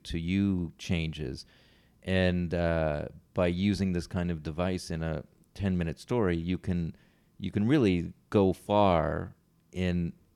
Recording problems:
none

